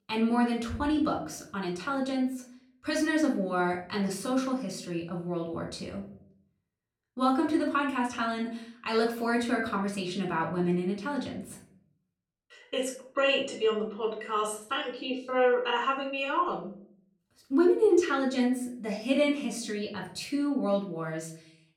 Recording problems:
off-mic speech; far
room echo; slight; dies away in 0.5 s

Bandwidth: 17 kHz